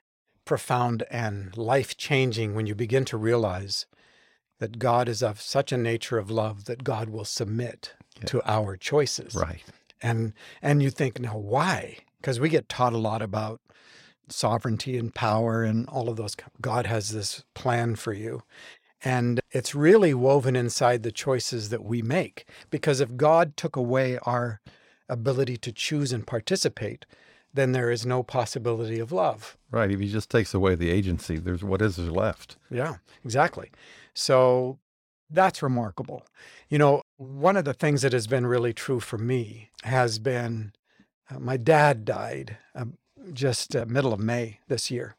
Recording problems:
none

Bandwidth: 16.5 kHz